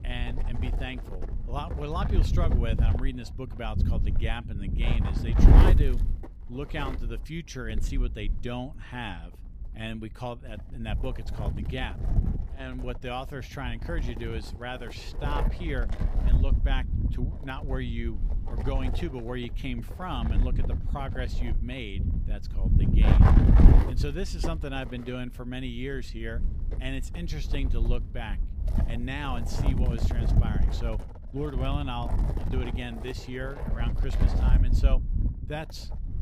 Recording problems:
wind noise on the microphone; heavy; 2 dB below the speech

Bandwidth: 15.5 kHz